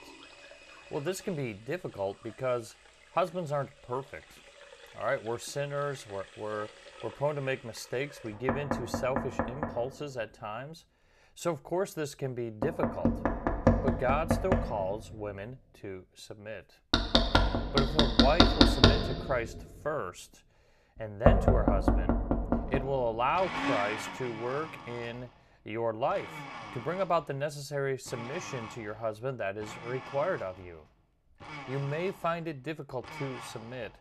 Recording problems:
household noises; very loud; throughout; 5 dB above the speech

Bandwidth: 14 kHz